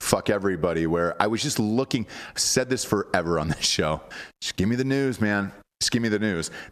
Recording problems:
squashed, flat; somewhat

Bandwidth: 14 kHz